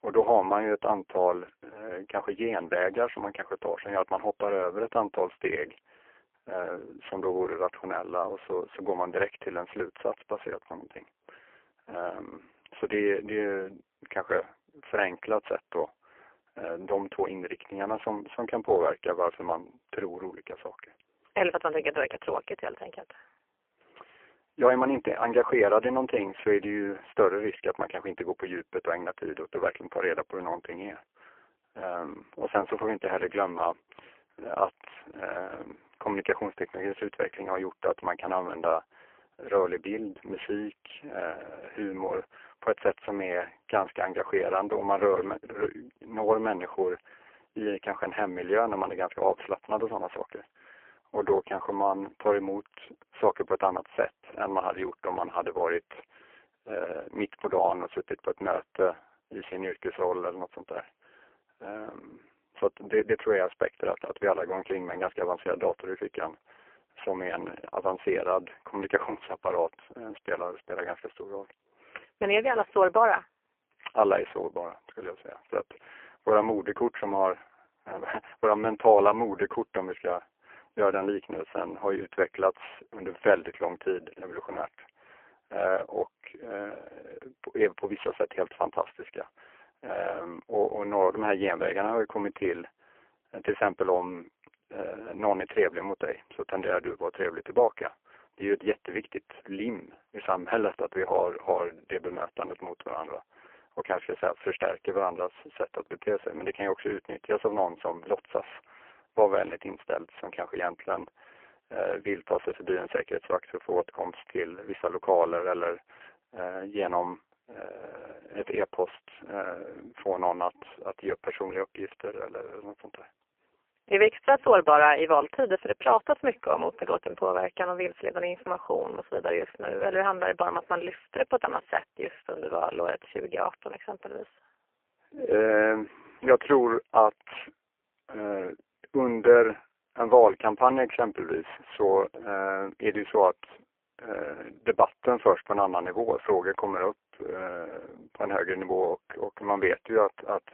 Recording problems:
phone-call audio; poor line

